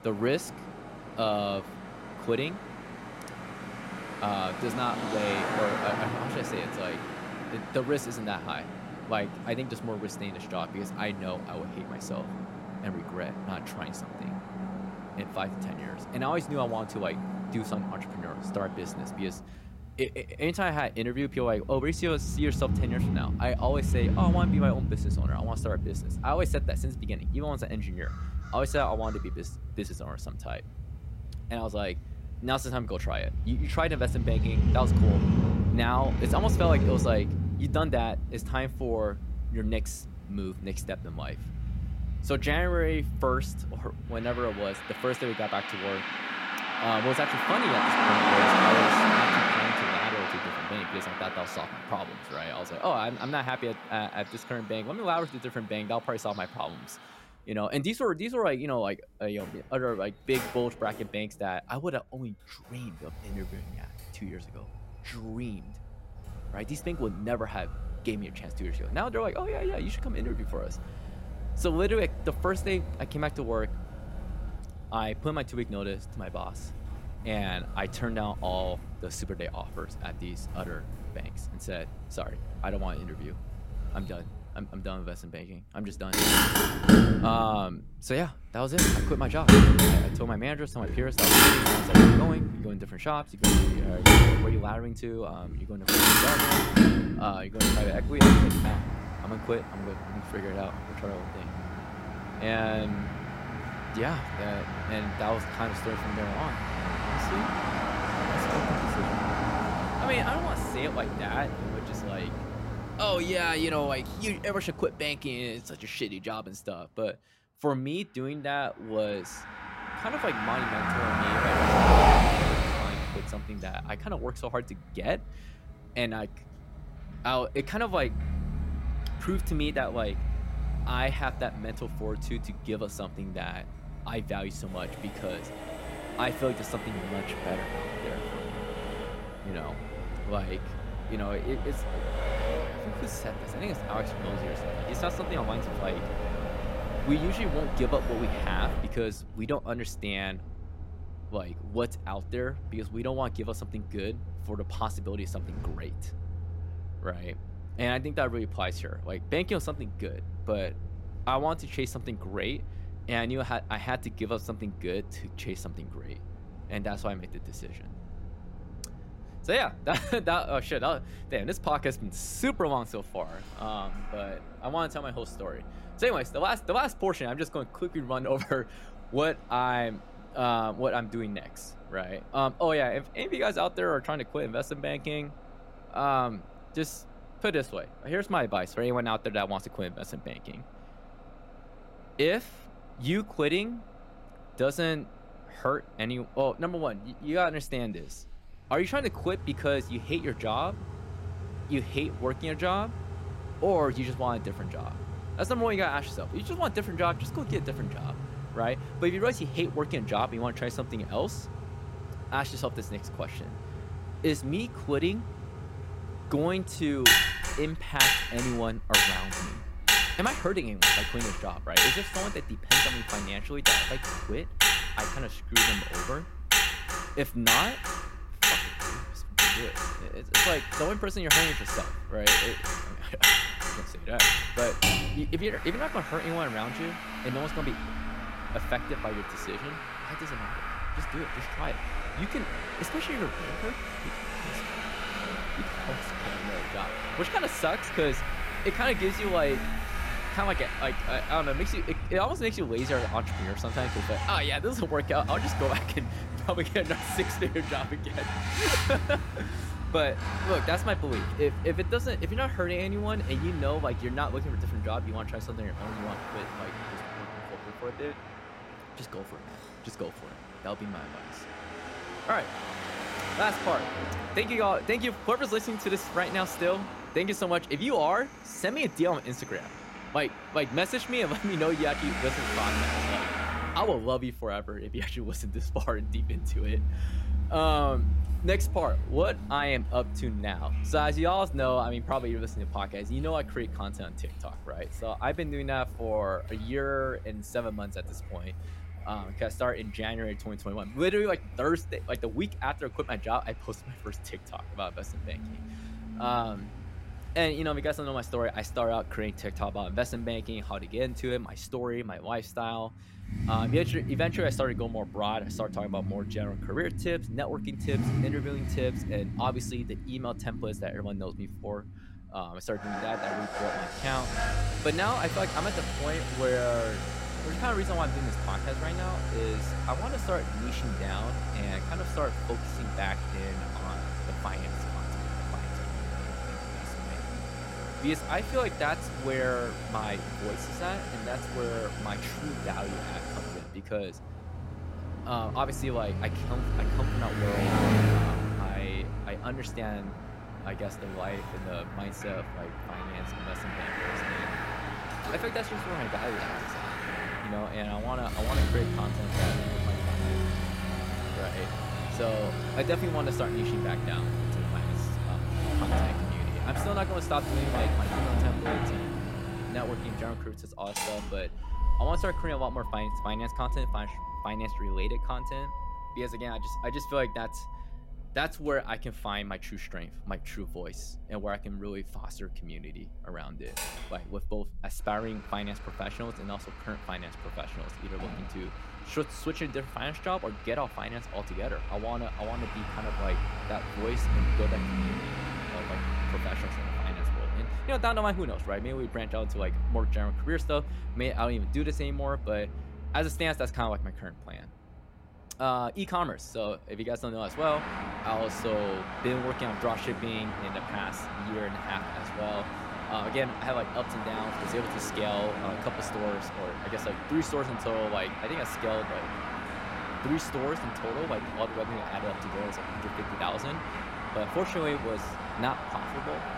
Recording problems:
traffic noise; very loud; throughout; 2 dB above the speech

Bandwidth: 16 kHz